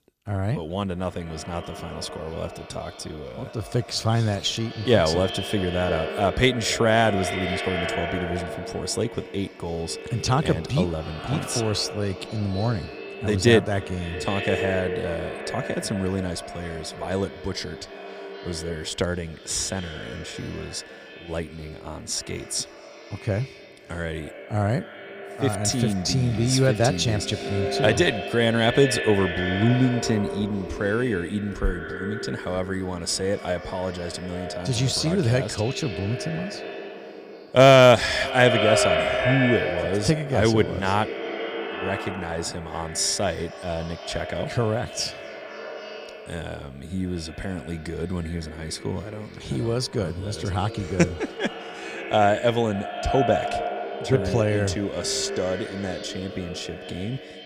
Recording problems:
echo of what is said; strong; throughout; 250 ms later, 7 dB below the speech

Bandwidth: 15 kHz